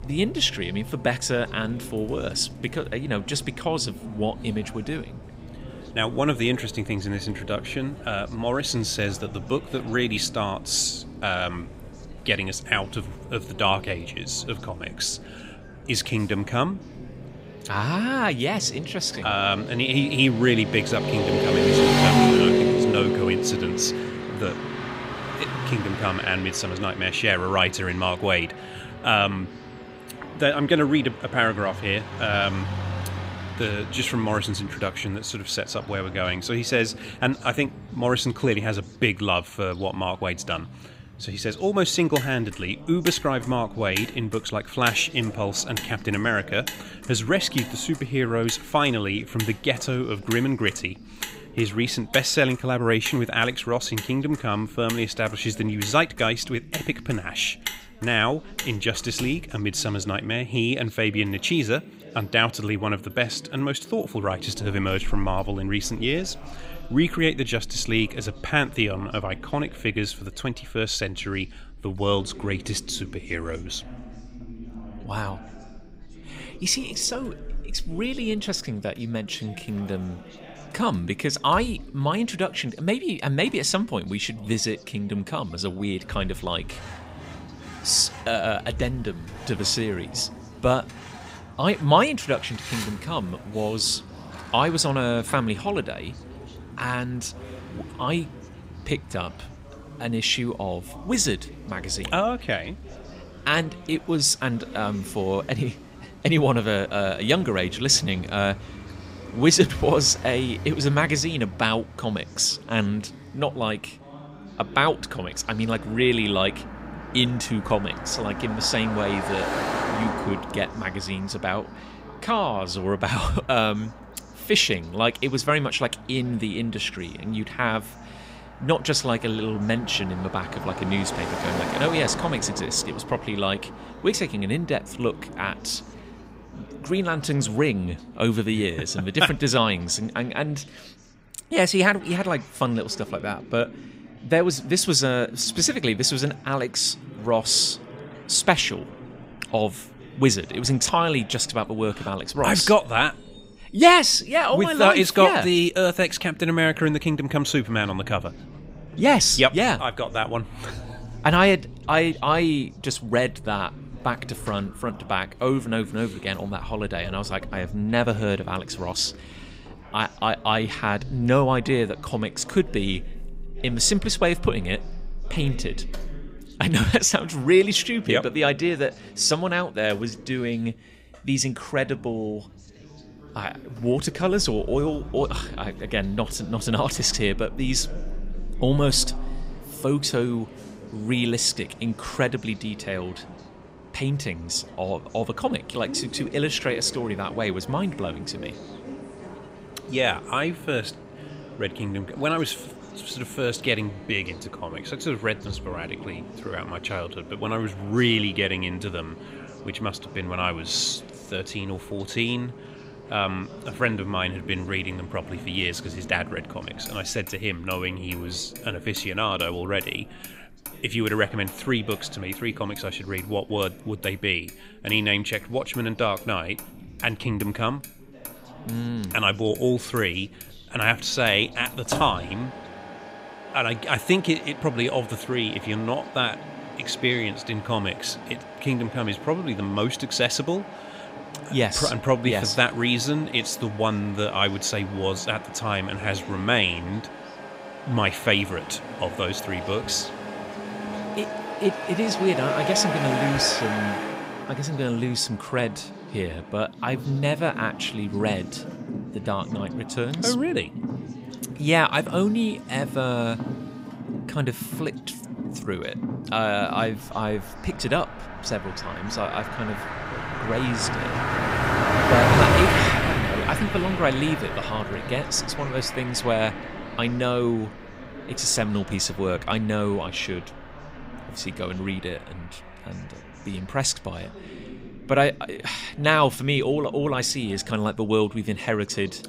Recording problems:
traffic noise; loud; throughout; 8 dB below the speech
background chatter; noticeable; throughout; 3 voices, 20 dB below the speech

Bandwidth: 15.5 kHz